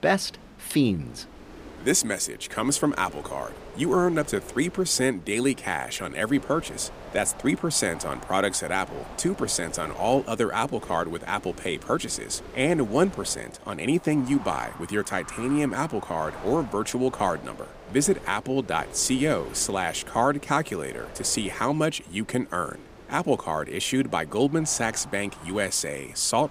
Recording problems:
wind noise on the microphone; occasional gusts; 15 dB below the speech

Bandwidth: 15 kHz